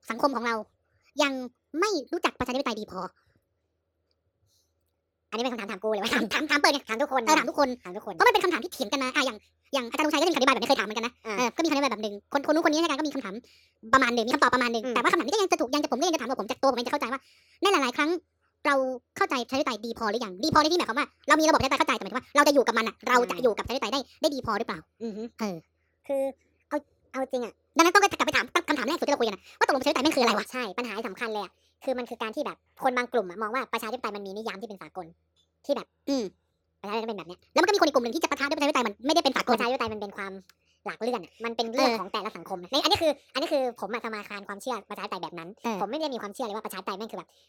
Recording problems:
wrong speed and pitch; too fast and too high; 1.6 times normal speed

